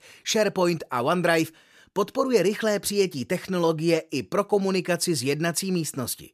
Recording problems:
none

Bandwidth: 14.5 kHz